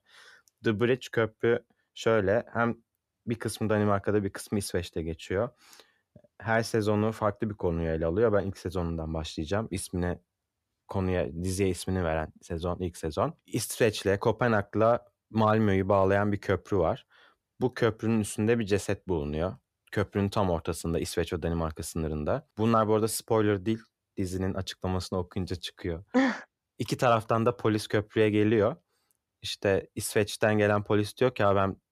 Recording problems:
none

